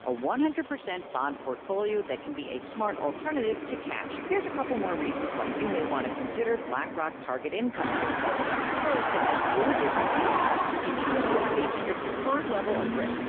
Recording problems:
phone-call audio; poor line
traffic noise; very loud; throughout; 2 dB above the speech

